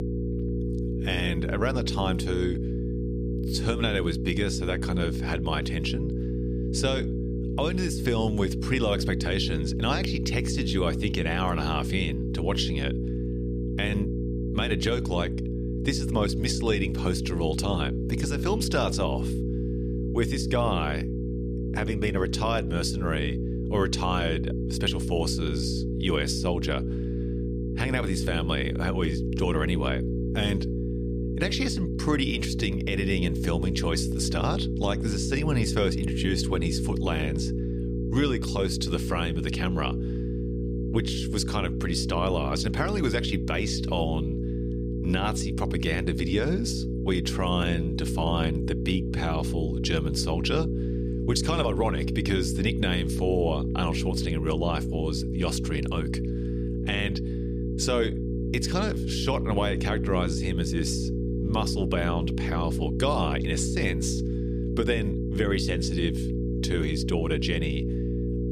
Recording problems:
electrical hum; loud; throughout; 60 Hz, 6 dB below the speech

